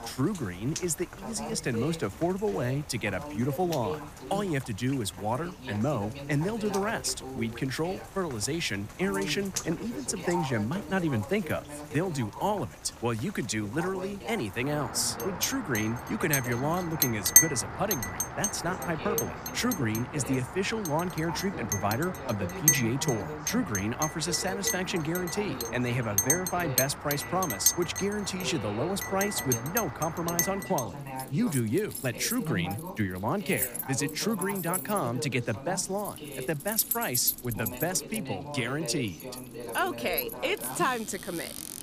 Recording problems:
household noises; very loud; from 15 s on; 1 dB above the speech
rain or running water; noticeable; throughout; 10 dB below the speech
voice in the background; noticeable; throughout; 10 dB below the speech

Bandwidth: 15 kHz